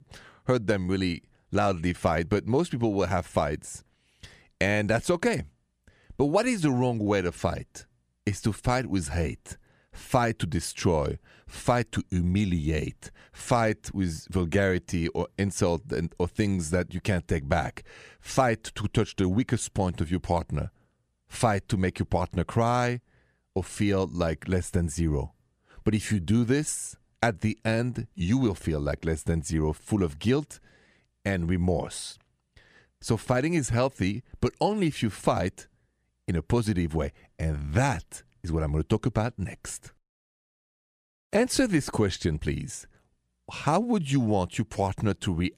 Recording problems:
none

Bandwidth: 14.5 kHz